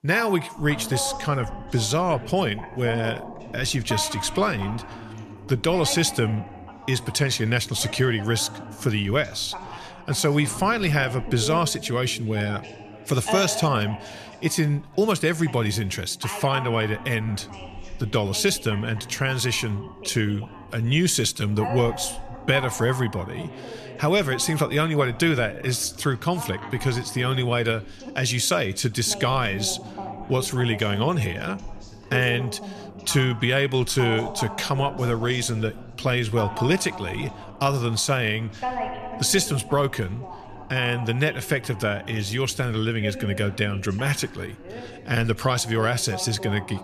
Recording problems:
background chatter; noticeable; throughout; 2 voices, 15 dB below the speech

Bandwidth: 13.5 kHz